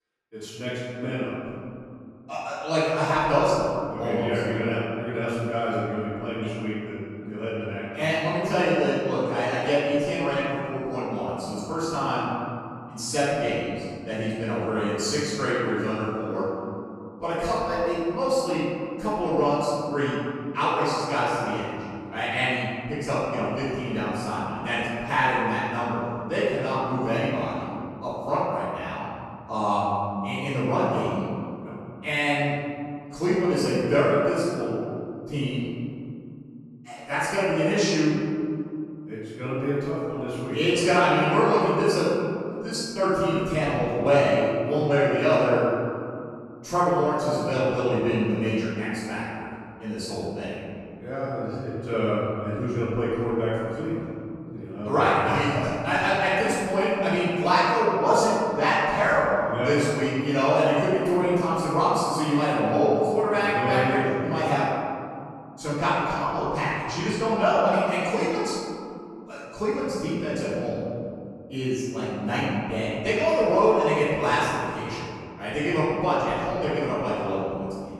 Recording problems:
room echo; strong; dies away in 2.6 s
off-mic speech; far

